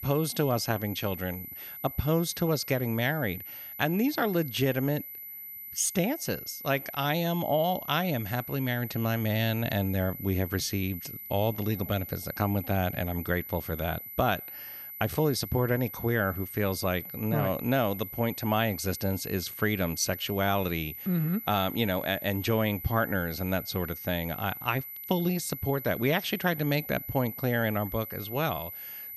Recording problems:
high-pitched whine; loud; throughout; 12 kHz, 9 dB below the speech

